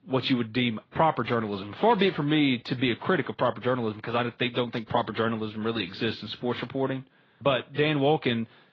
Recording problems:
garbled, watery; badly
muffled; very slightly; fading above 4 kHz

